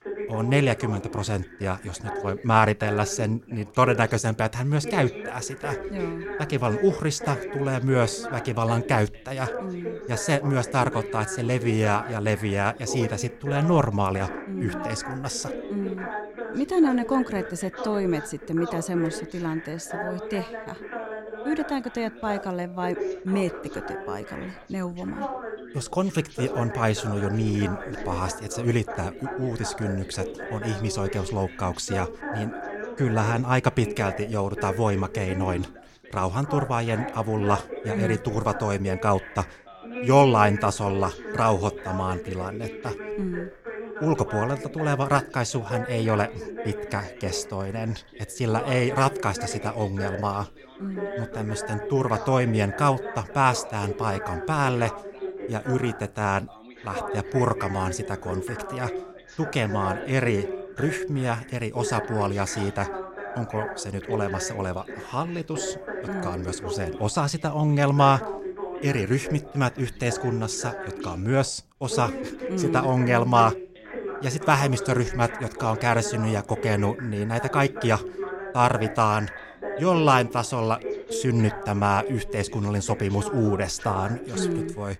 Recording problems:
background chatter; loud; throughout; 2 voices, 9 dB below the speech

